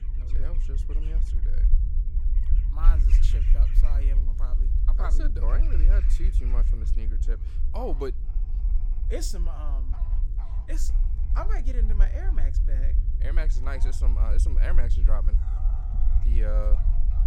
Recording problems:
low rumble; loud; throughout; 9 dB below the speech
animal sounds; noticeable; throughout; 15 dB below the speech
electrical hum; faint; throughout; 50 Hz, 25 dB below the speech

